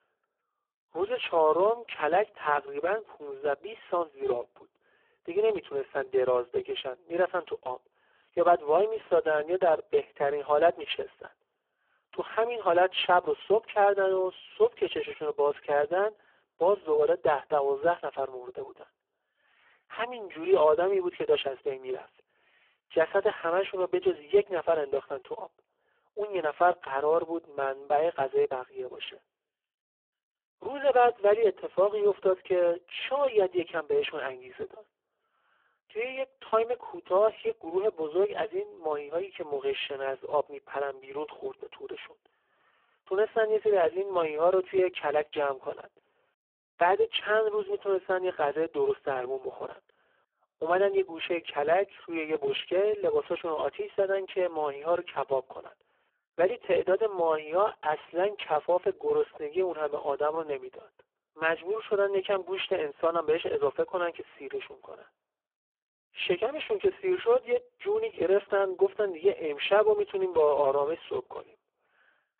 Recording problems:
phone-call audio; poor line

